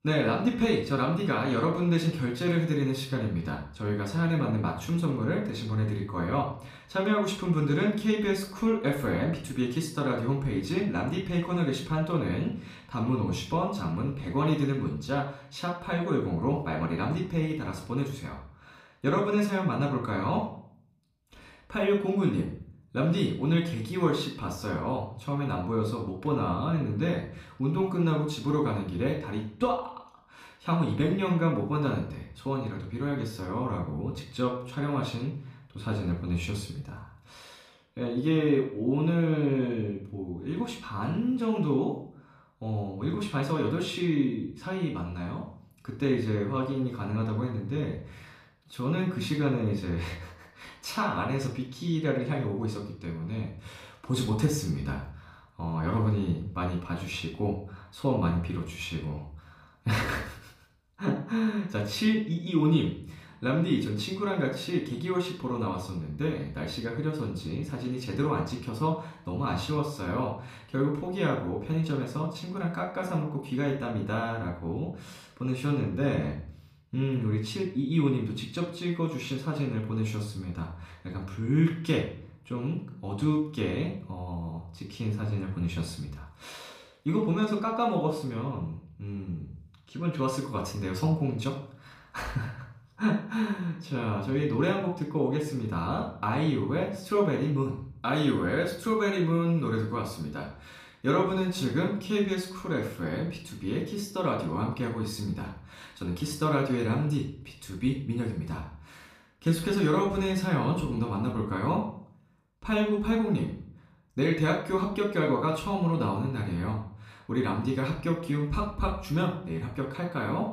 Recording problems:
off-mic speech; far
room echo; slight; dies away in 0.5 s

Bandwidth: 14.5 kHz